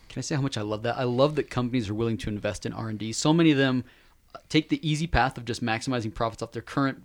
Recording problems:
none

